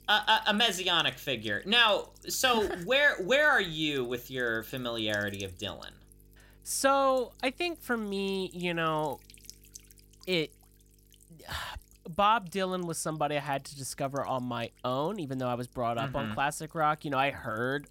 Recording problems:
electrical hum; faint; throughout; 50 Hz, 30 dB below the speech

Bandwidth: 16 kHz